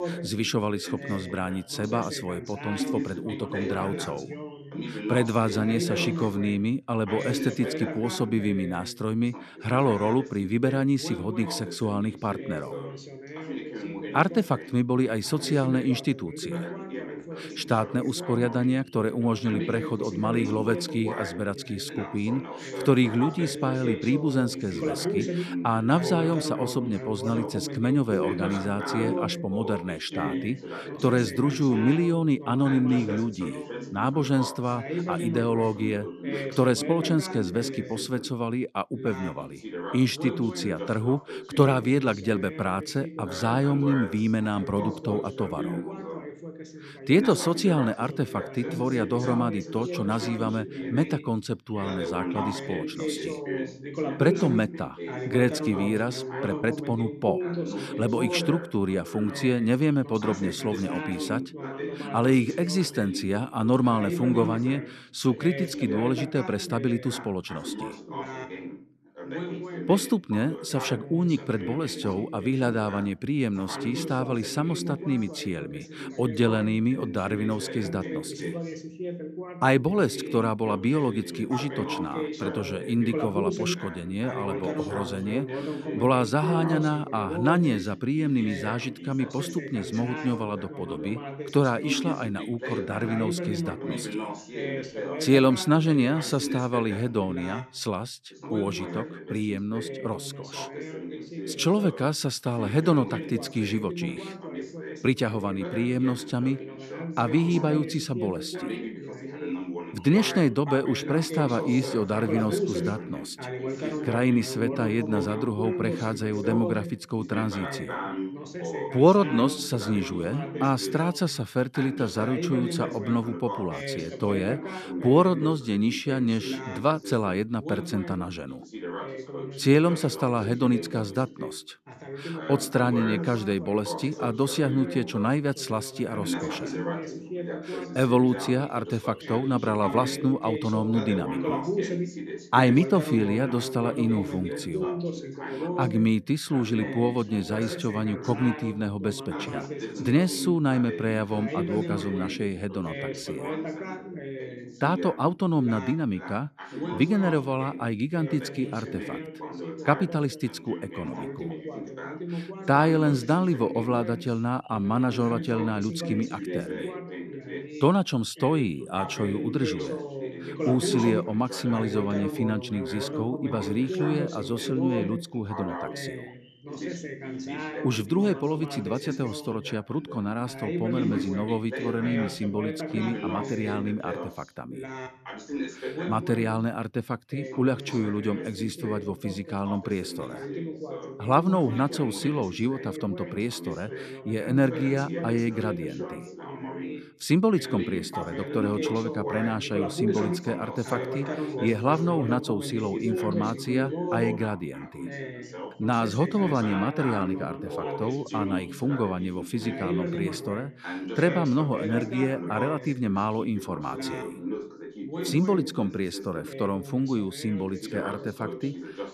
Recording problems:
background chatter; loud; throughout; 2 voices, 7 dB below the speech

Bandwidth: 13.5 kHz